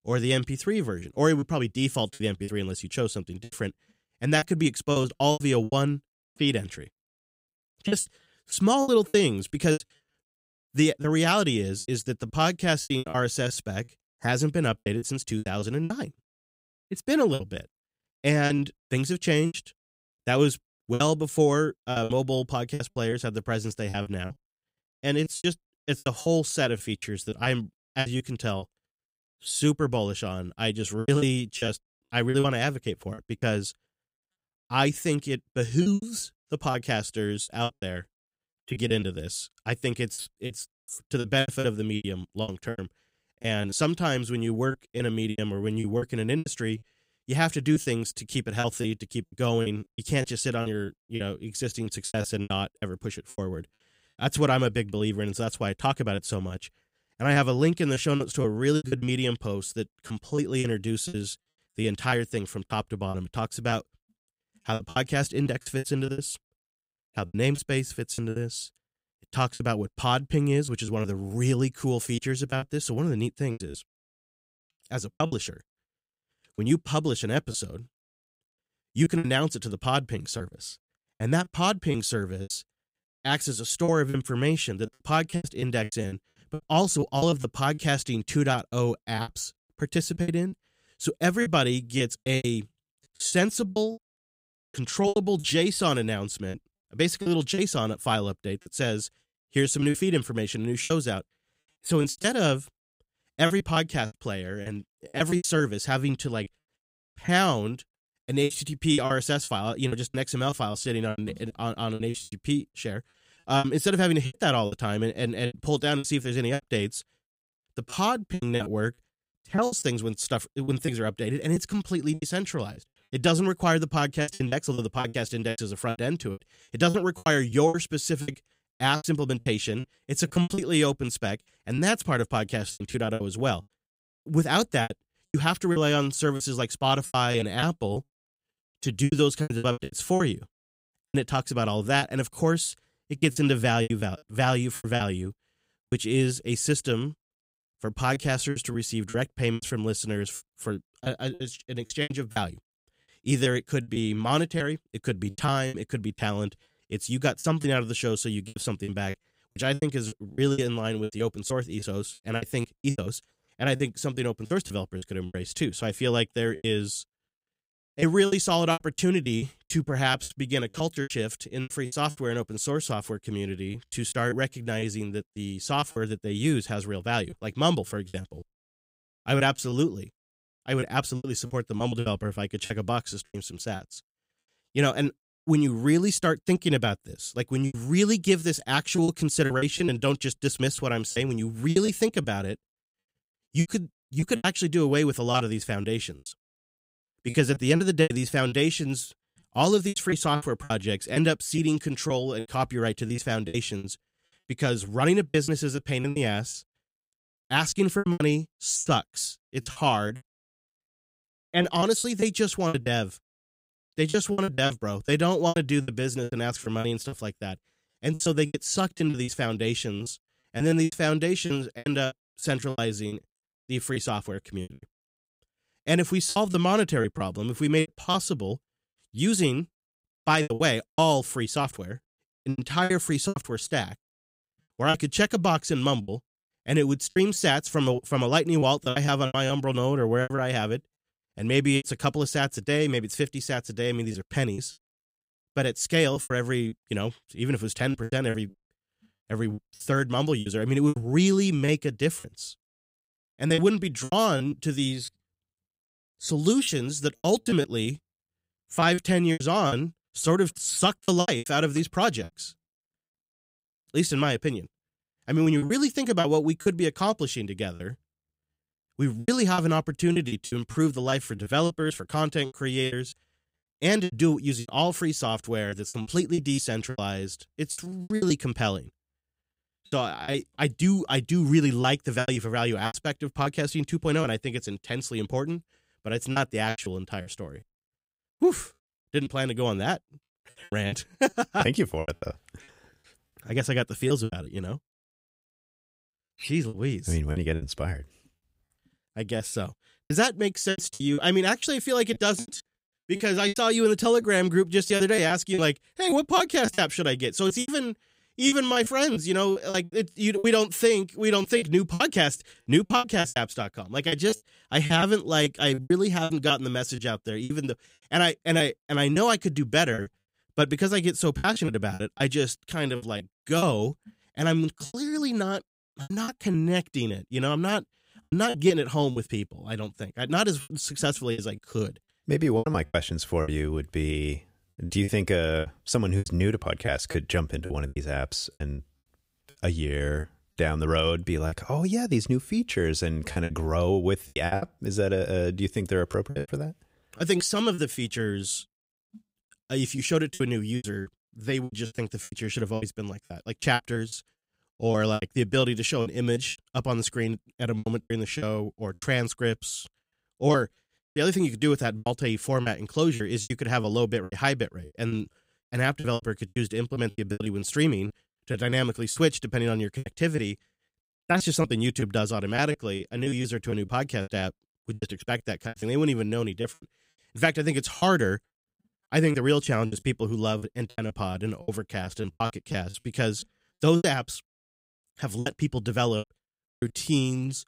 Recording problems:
choppy; very; 11% of the speech affected

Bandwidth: 15.5 kHz